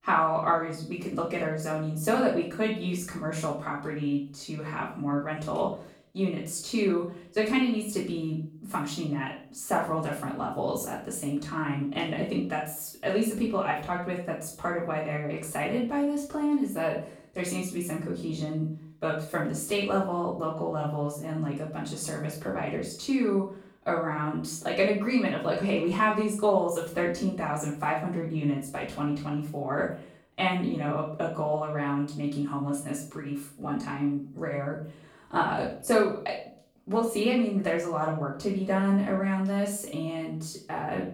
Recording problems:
off-mic speech; far
room echo; noticeable; dies away in 0.4 s

